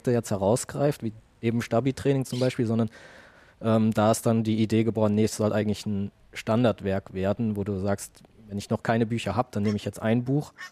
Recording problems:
animal sounds; faint; throughout; 25 dB below the speech

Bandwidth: 14.5 kHz